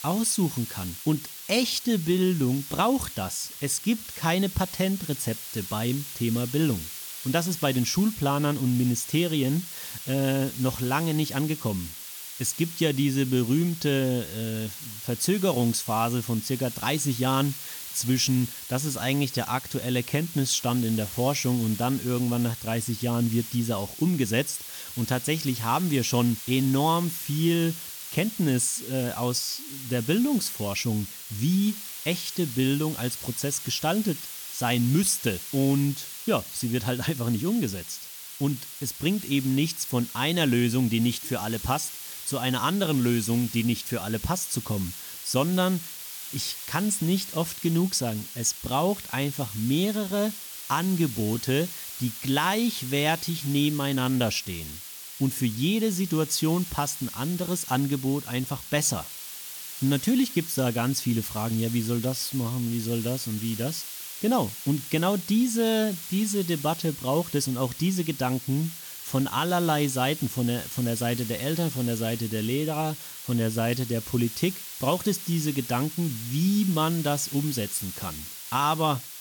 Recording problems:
hiss; loud; throughout; 9 dB below the speech

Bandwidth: 18.5 kHz